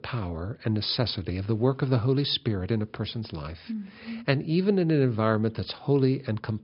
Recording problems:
high frequencies cut off; noticeable; nothing above 5.5 kHz

